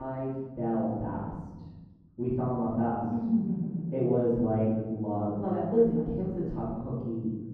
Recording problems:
off-mic speech; far
muffled; very; fading above 1.5 kHz
room echo; noticeable; dies away in 1.3 s
abrupt cut into speech; at the start

